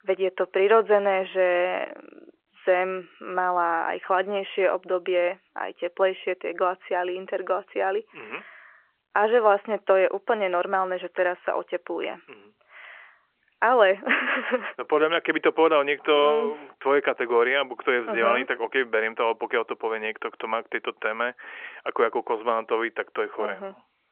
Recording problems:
phone-call audio; nothing above 3 kHz

